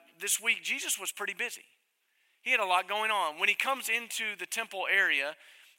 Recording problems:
thin; very; fading below 600 Hz

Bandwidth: 16 kHz